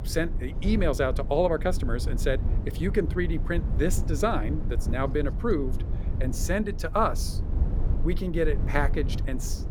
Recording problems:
low rumble; noticeable; throughout; 15 dB below the speech

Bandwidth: 18.5 kHz